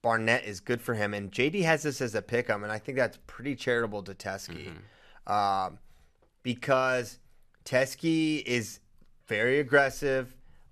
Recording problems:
none

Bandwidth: 13.5 kHz